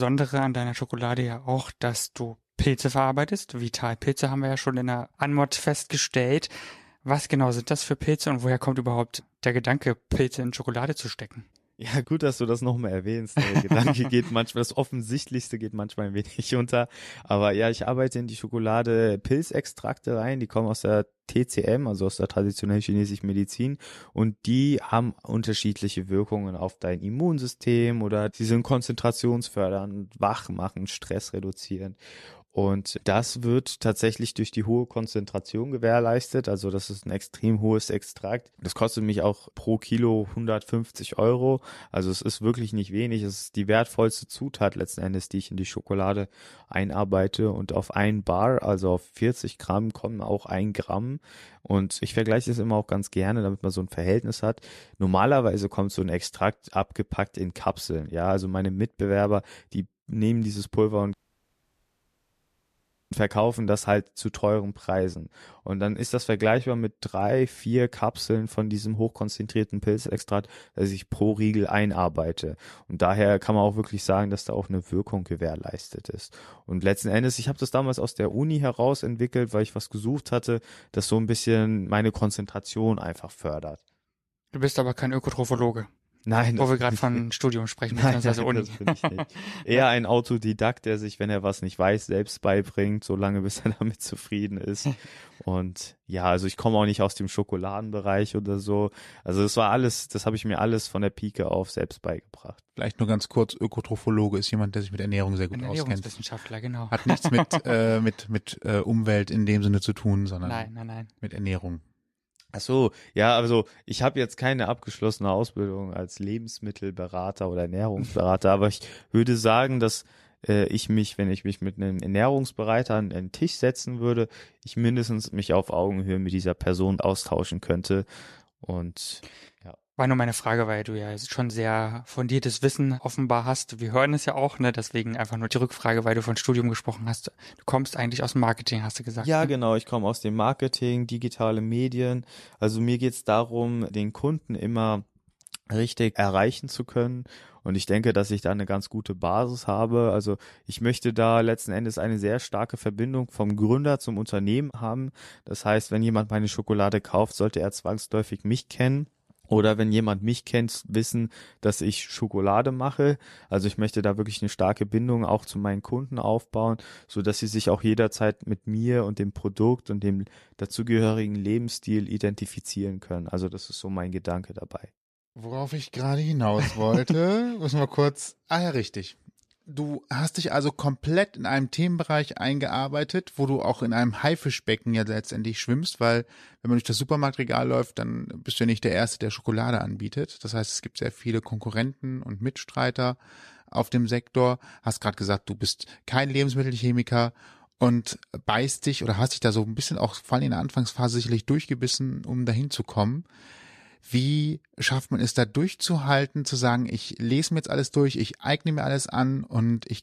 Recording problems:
abrupt cut into speech; at the start
audio cutting out; at 1:01 for 2 s

